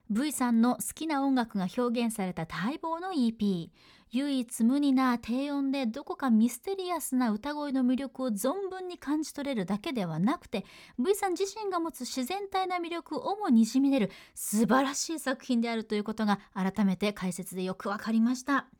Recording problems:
none

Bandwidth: 18.5 kHz